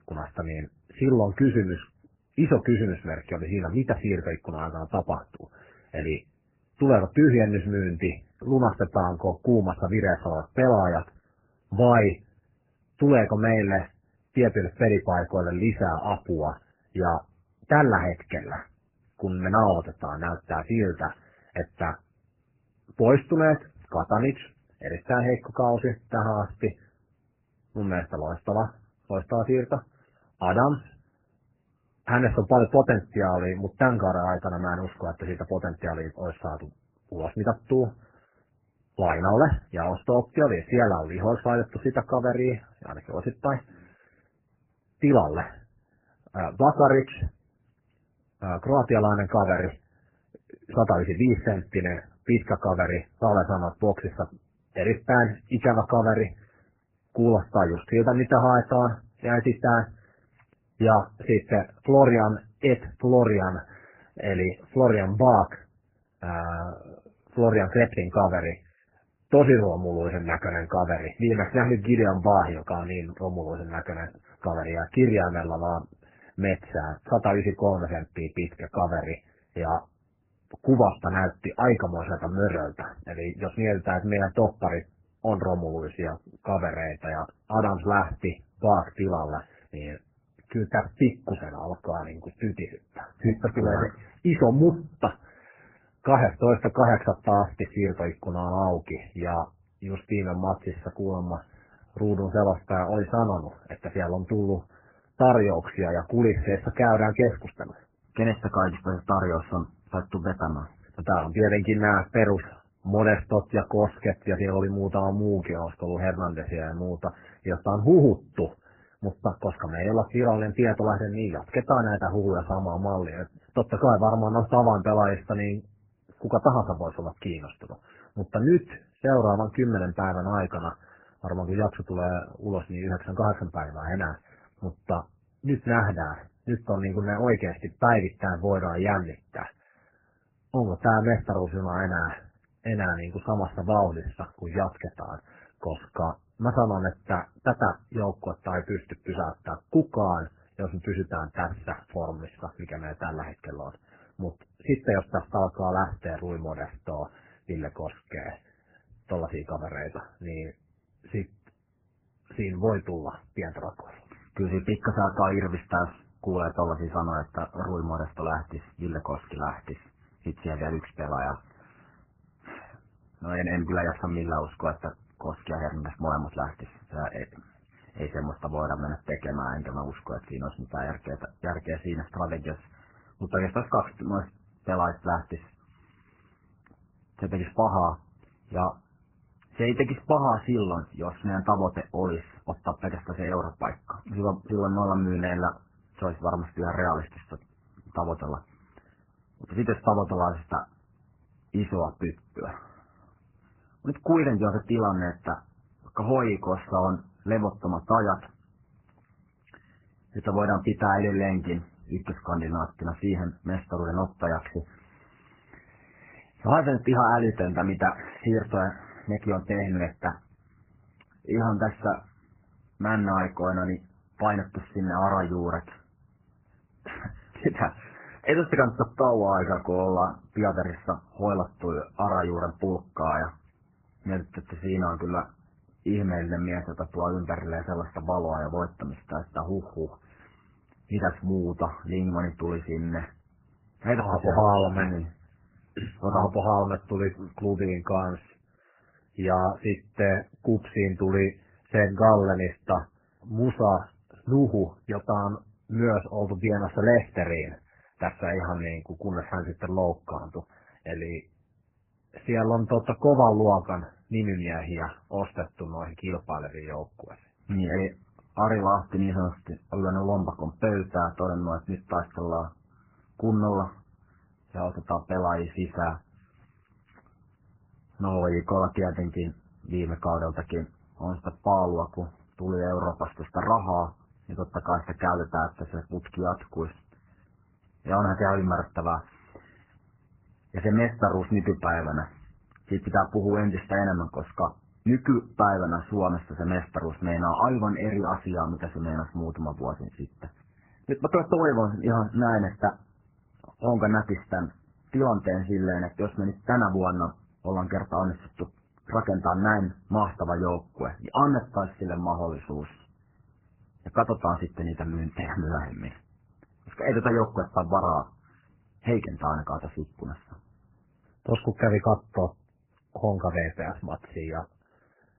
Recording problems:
garbled, watery; badly; nothing above 3 kHz

